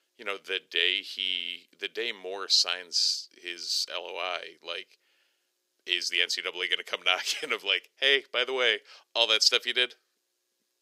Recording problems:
thin; very; fading below 400 Hz

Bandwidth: 15.5 kHz